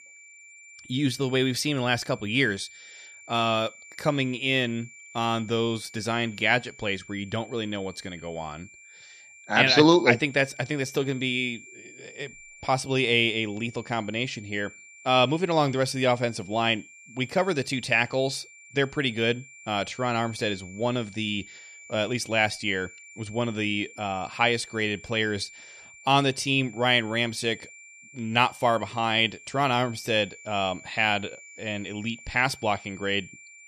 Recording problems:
high-pitched whine; faint; throughout; 2.5 kHz, 20 dB below the speech

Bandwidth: 14 kHz